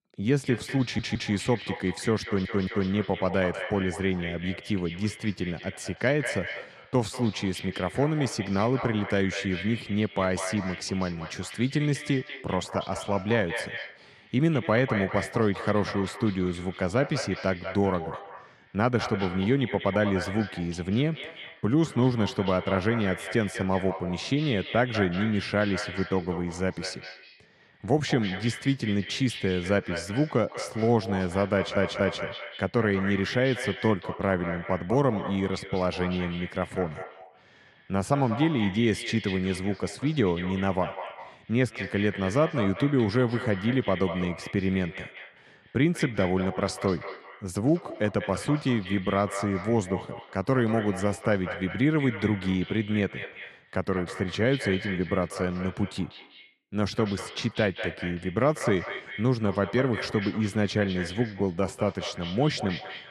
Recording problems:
echo of what is said; strong; throughout; 190 ms later, 10 dB below the speech
audio stuttering; at 1 s, at 2 s and at 32 s

